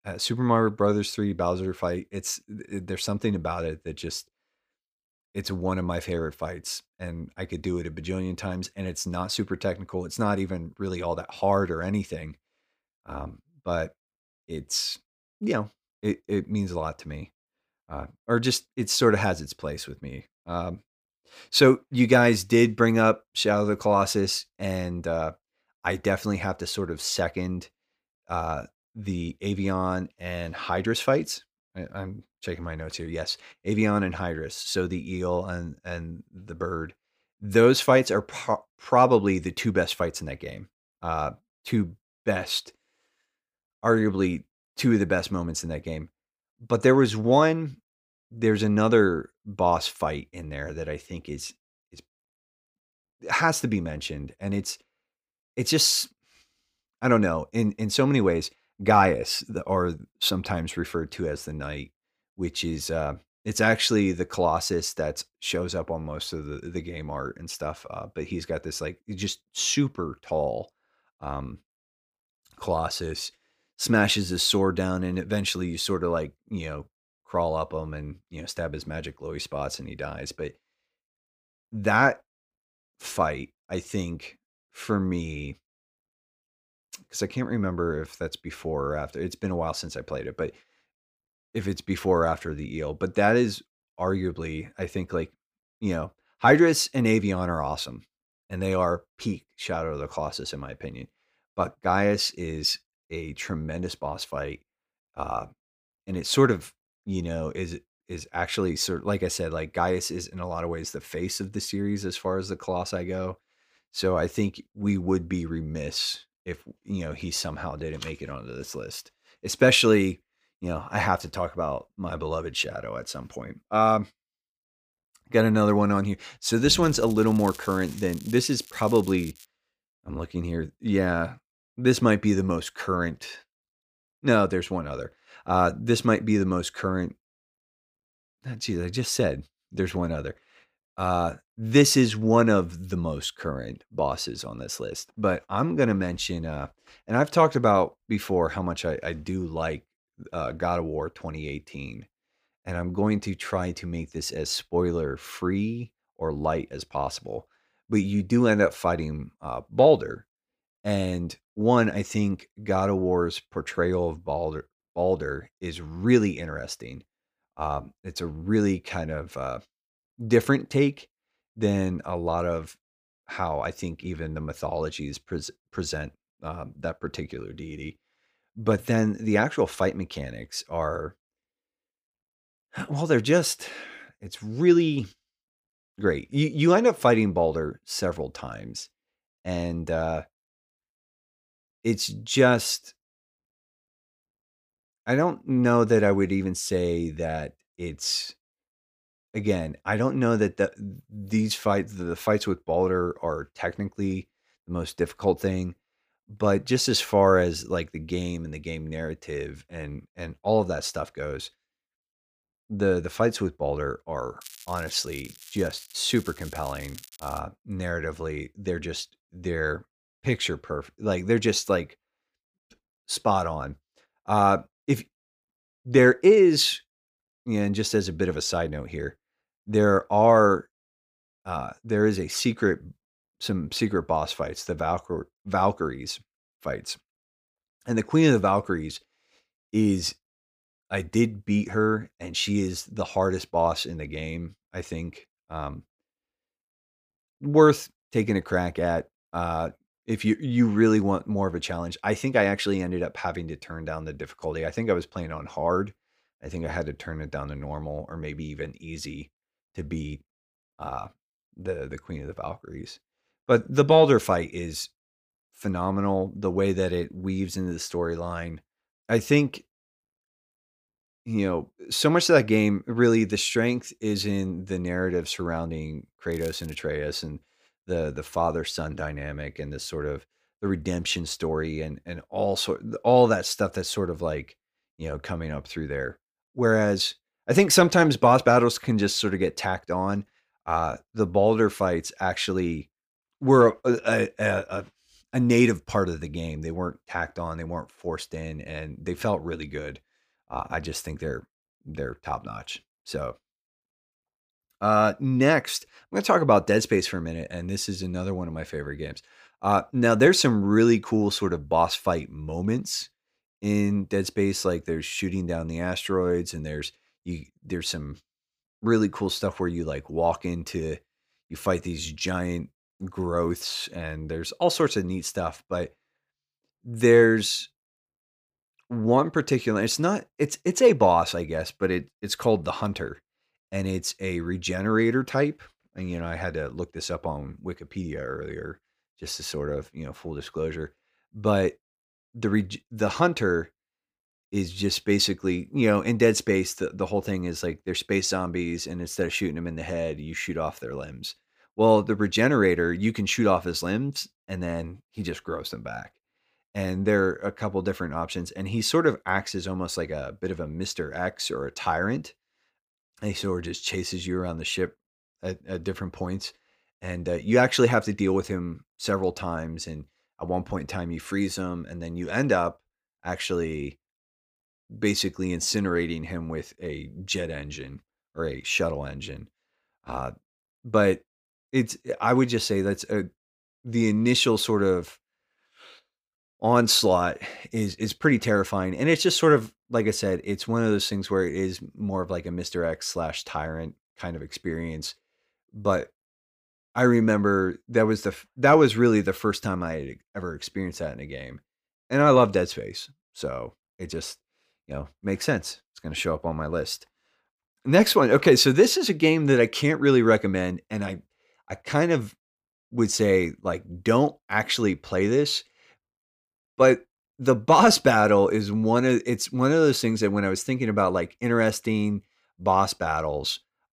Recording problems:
crackling; noticeable; from 2:07 to 2:09, from 3:34 to 3:37 and at 4:36; 20 dB below the speech

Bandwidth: 15 kHz